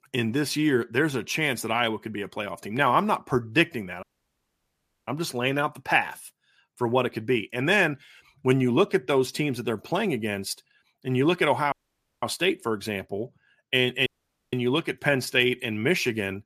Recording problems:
audio cutting out; at 4 s for 1 s, at 12 s for 0.5 s and at 14 s

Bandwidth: 14.5 kHz